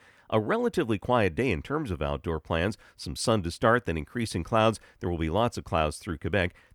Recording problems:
none

